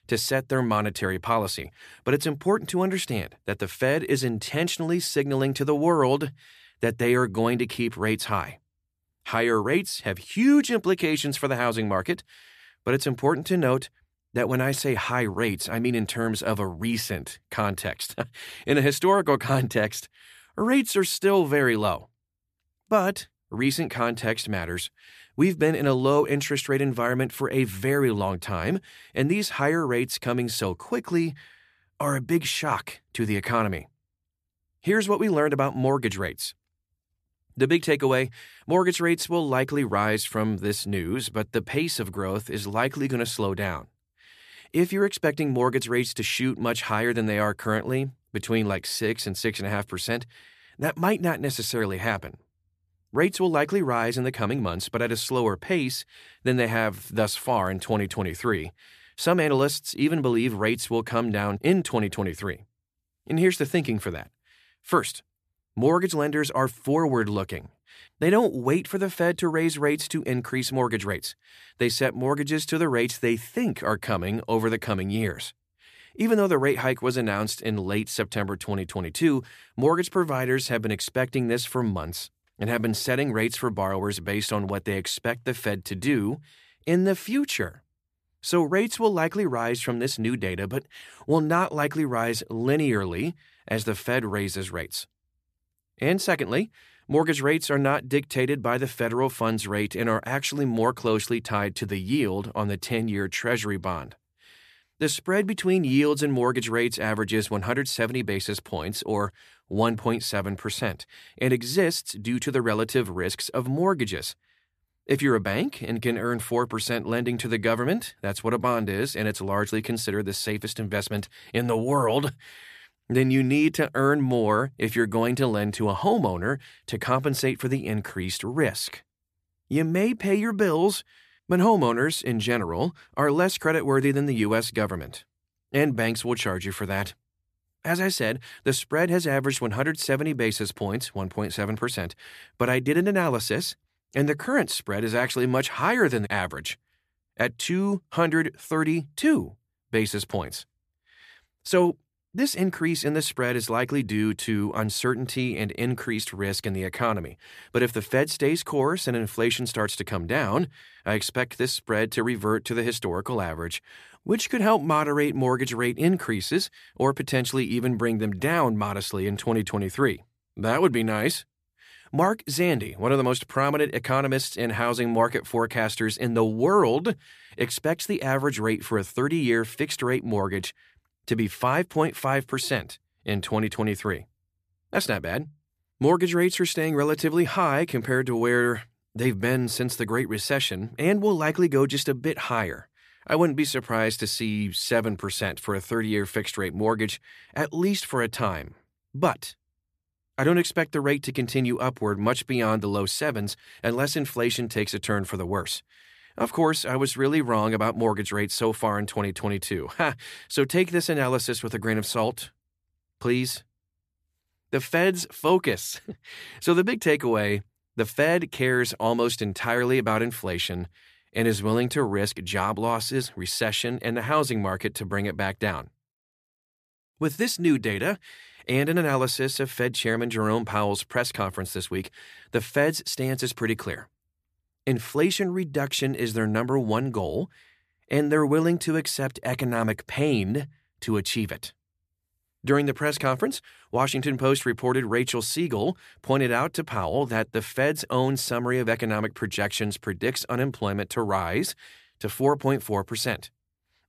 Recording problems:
none

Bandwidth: 14.5 kHz